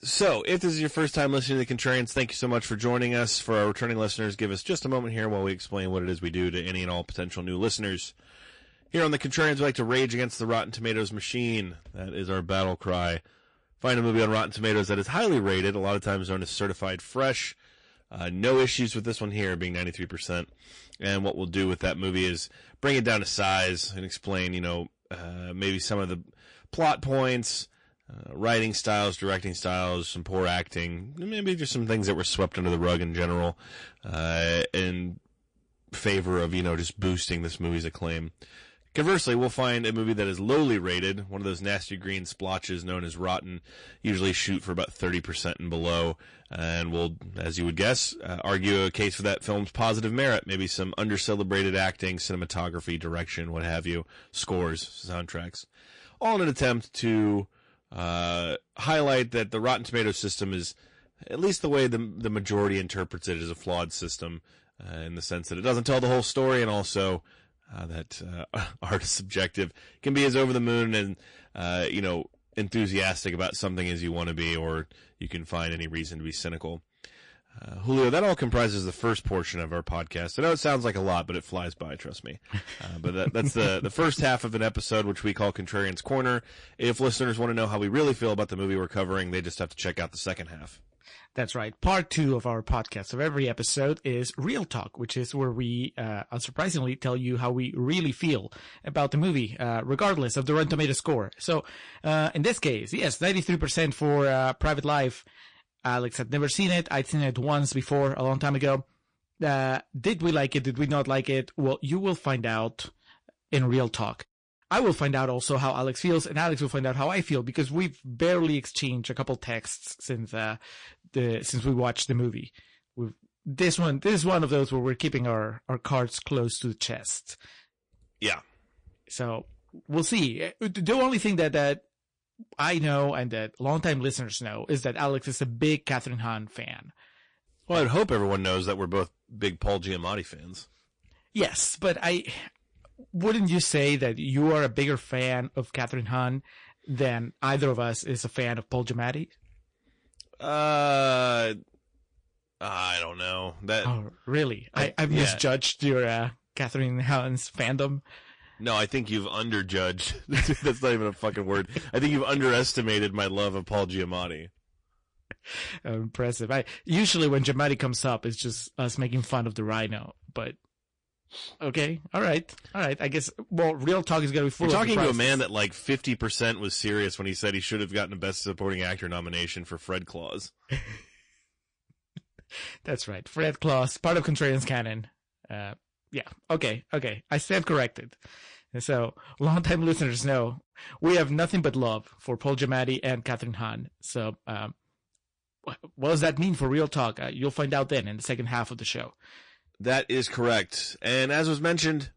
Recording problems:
distortion; slight; 4% of the sound clipped
garbled, watery; slightly; nothing above 9 kHz

